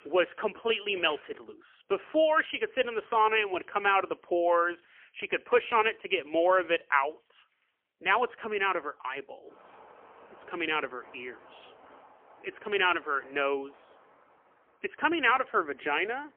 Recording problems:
phone-call audio; poor line; nothing above 3 kHz
traffic noise; faint; throughout; 30 dB below the speech

